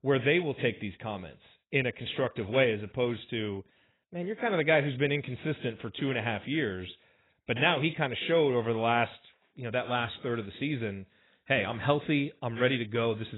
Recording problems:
garbled, watery; badly; nothing above 4 kHz
abrupt cut into speech; at the end

